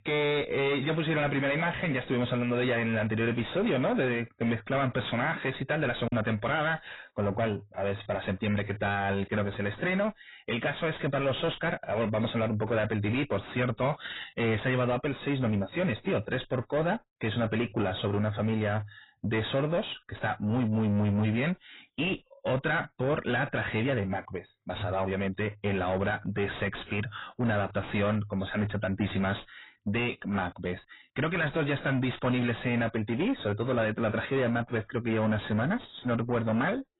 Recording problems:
distortion; heavy; 6 dB below the speech
garbled, watery; badly; nothing above 4 kHz
choppy; occasionally; at 6 s; 2% of the speech affected

